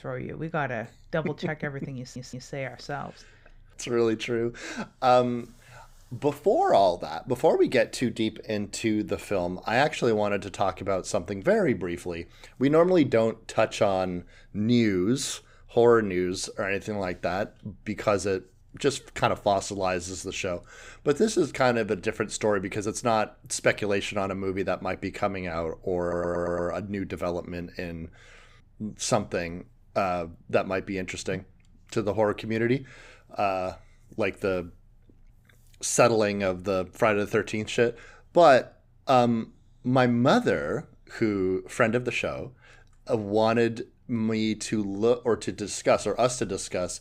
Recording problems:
audio stuttering; at 2 s and at 26 s

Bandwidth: 15.5 kHz